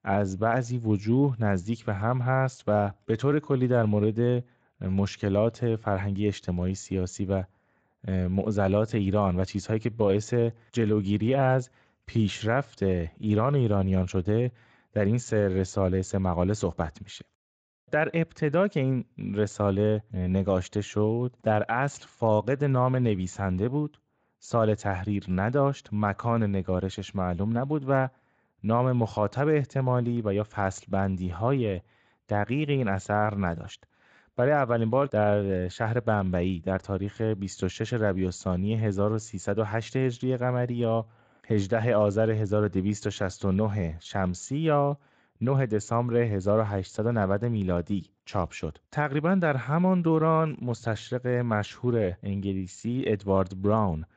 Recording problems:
garbled, watery; slightly; nothing above 7.5 kHz

